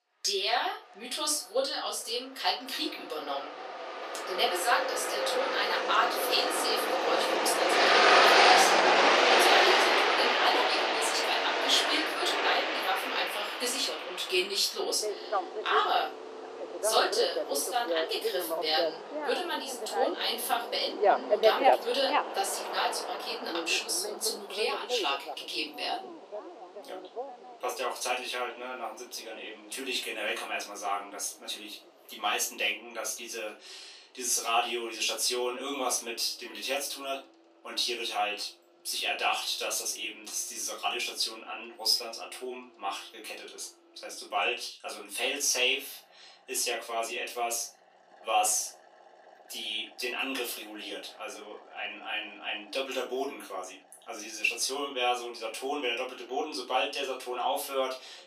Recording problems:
off-mic speech; far
thin; very; fading below 350 Hz
room echo; slight; dies away in 0.3 s
traffic noise; very loud; throughout; 4 dB above the speech

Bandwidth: 14.5 kHz